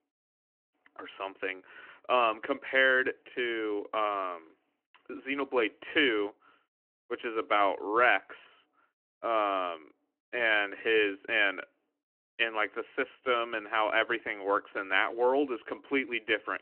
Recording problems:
phone-call audio; nothing above 3 kHz

